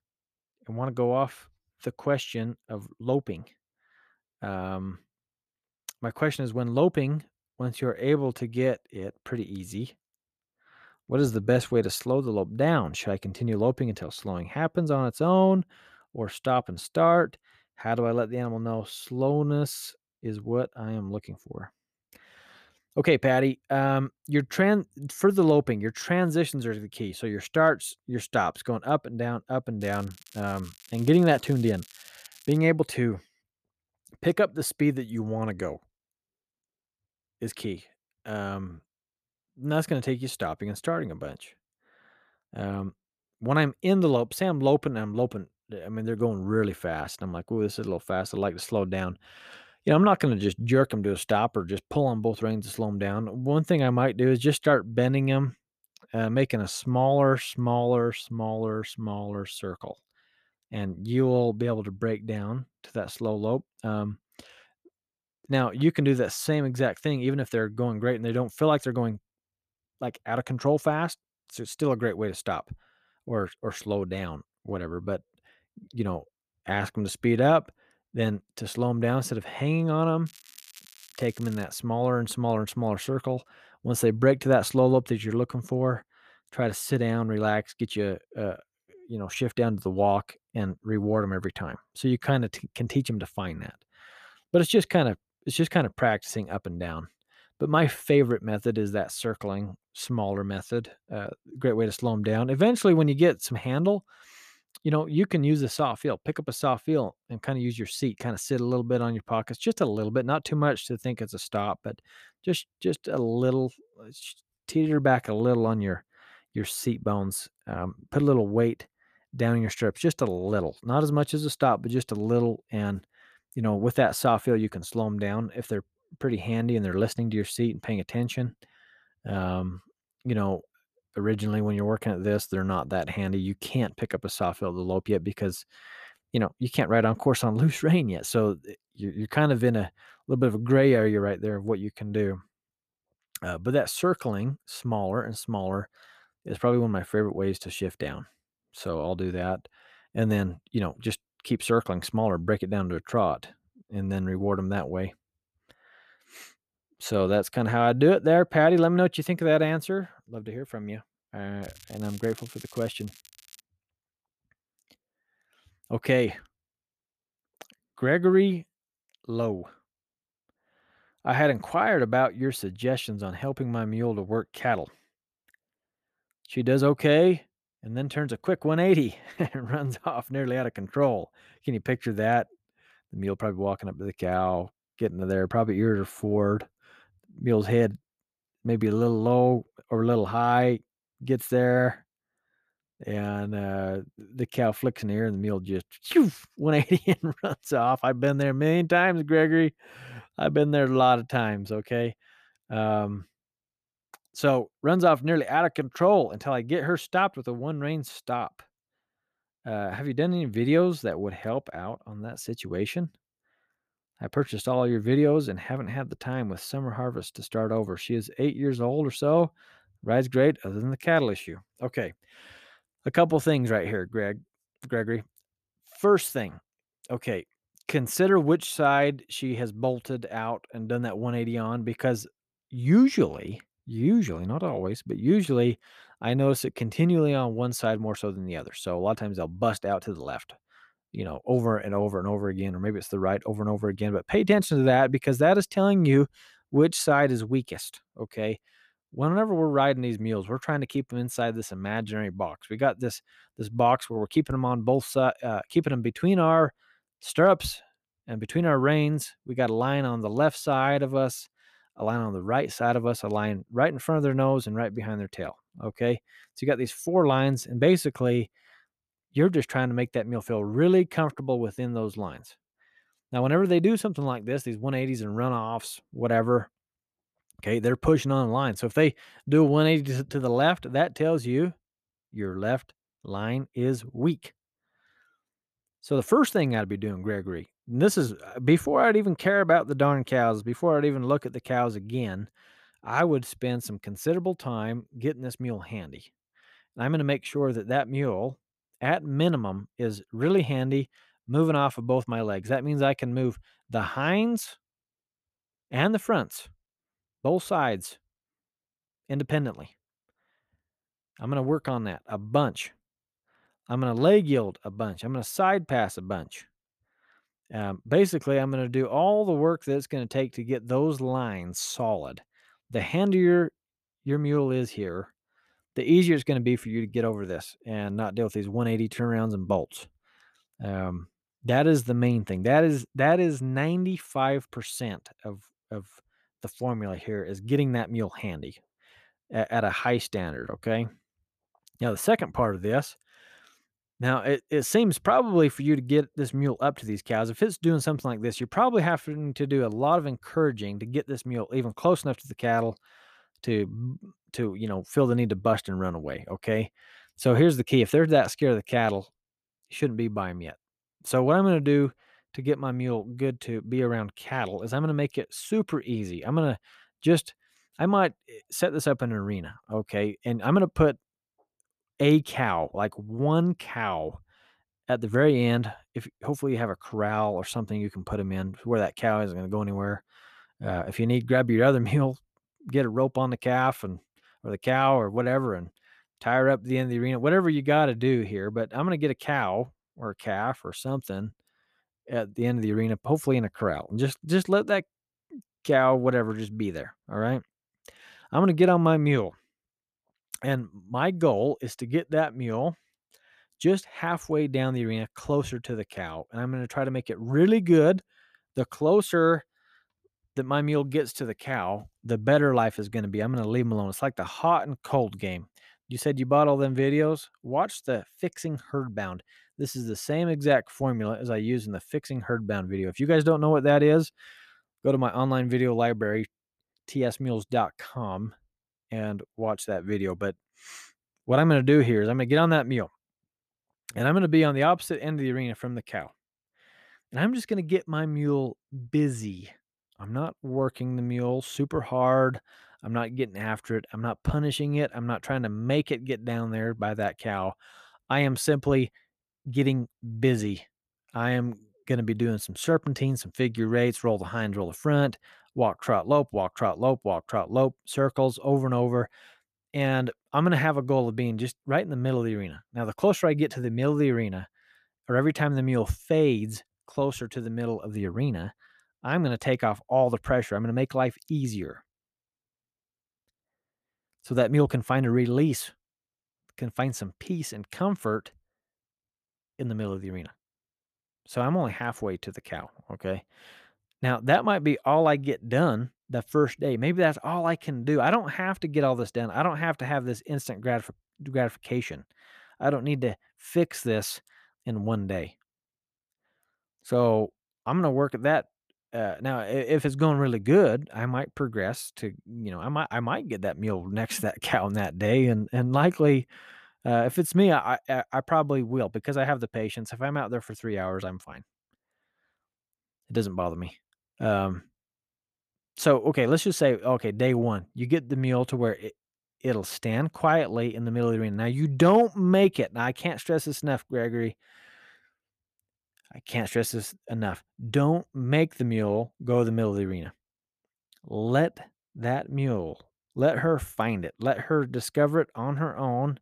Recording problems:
crackling; faint; from 30 to 33 s, from 1:20 to 1:22 and from 2:42 to 2:44; 25 dB below the speech

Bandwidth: 14.5 kHz